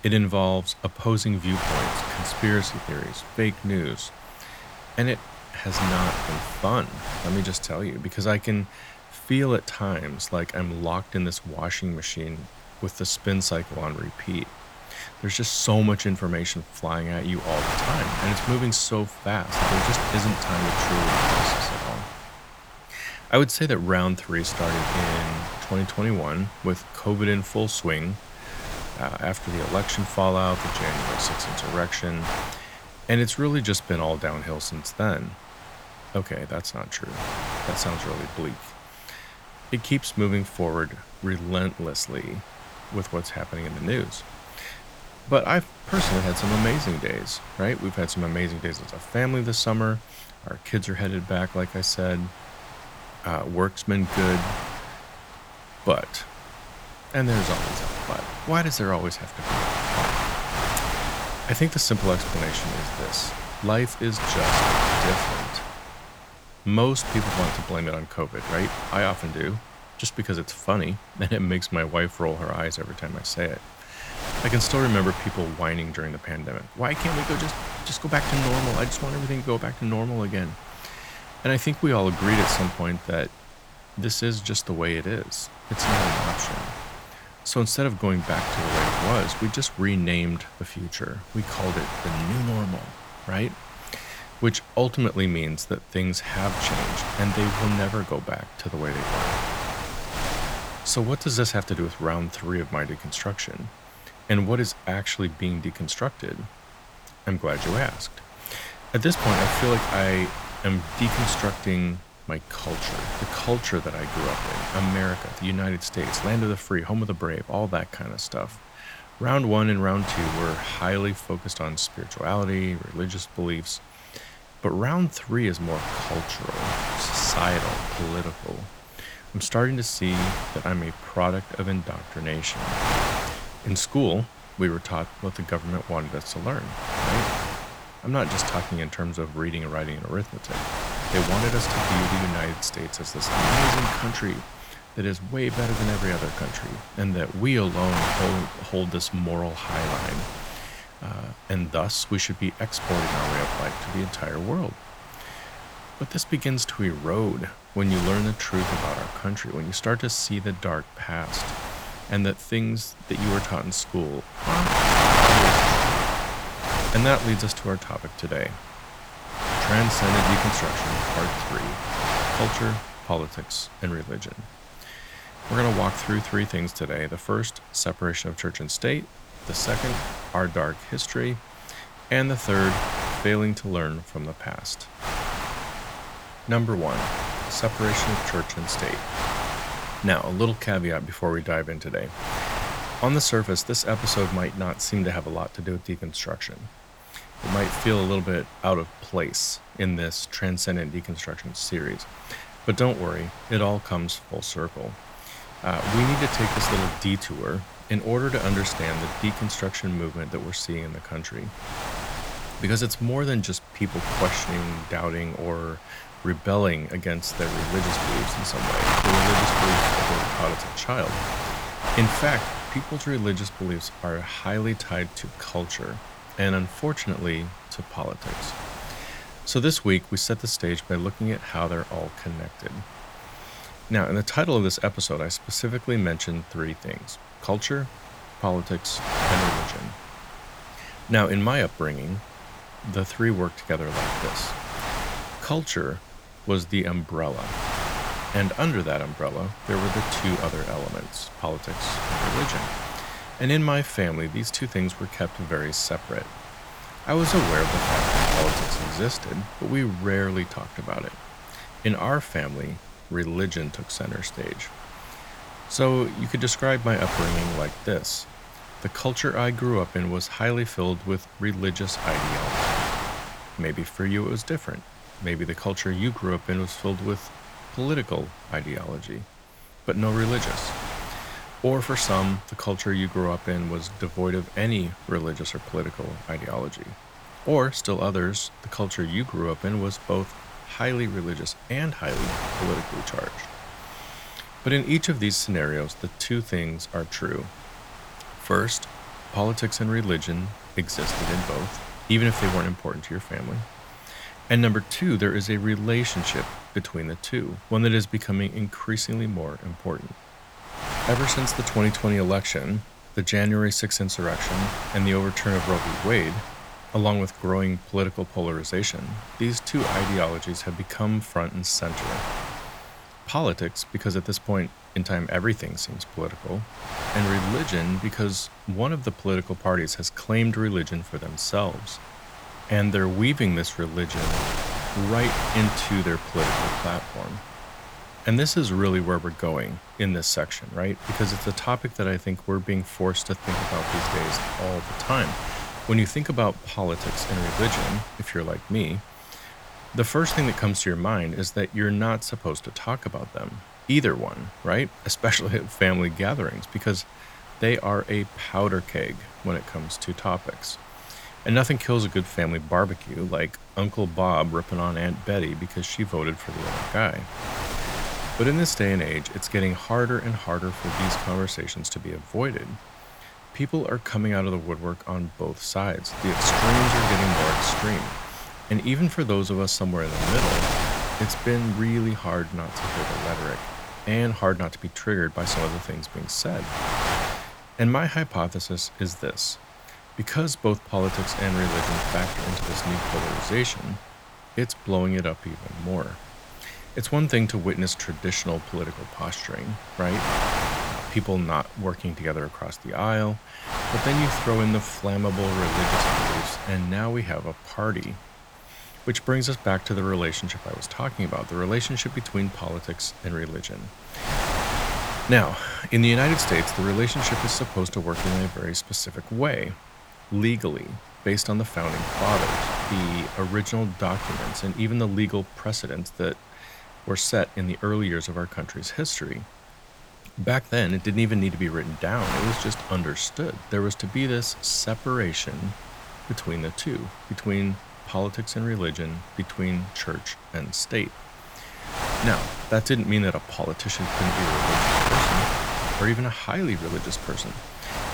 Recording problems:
wind noise on the microphone; heavy; as loud as the speech

